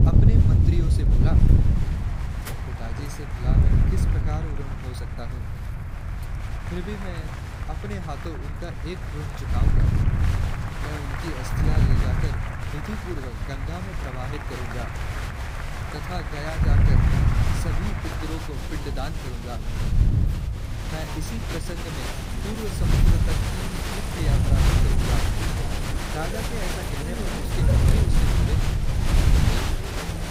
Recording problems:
crowd noise; very loud; throughout; 2 dB above the speech
wind noise on the microphone; heavy; 1 dB below the speech
traffic noise; loud; throughout; 8 dB below the speech

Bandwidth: 15.5 kHz